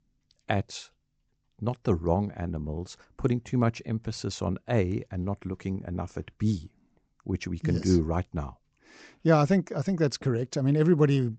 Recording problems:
high frequencies cut off; noticeable; nothing above 8 kHz

